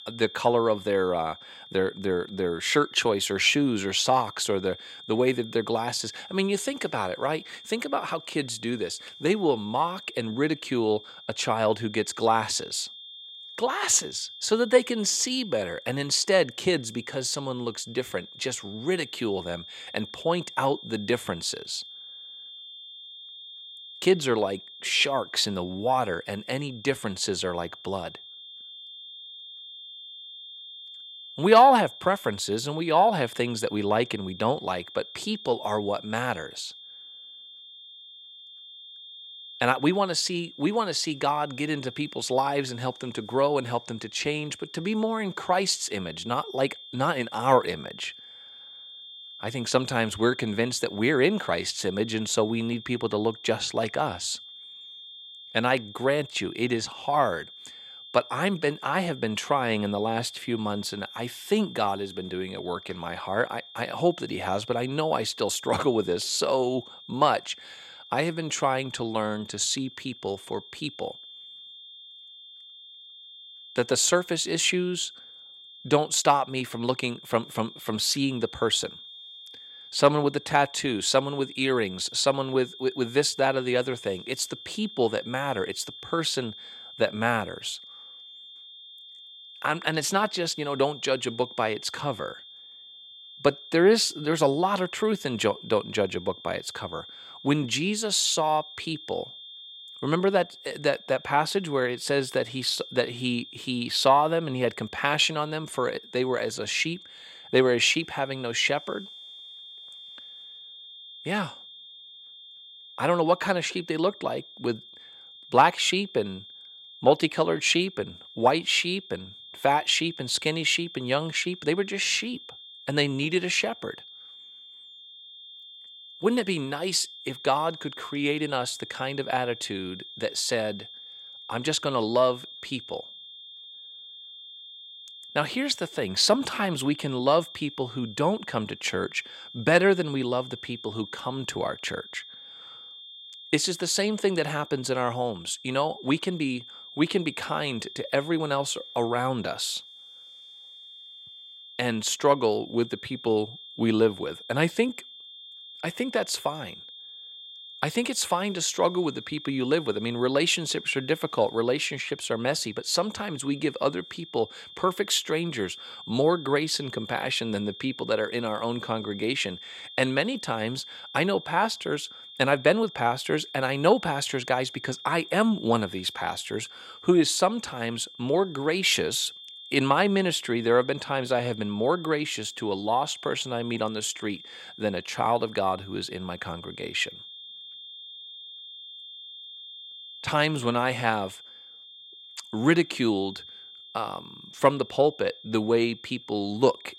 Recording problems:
high-pitched whine; noticeable; throughout; 3.5 kHz, 15 dB below the speech

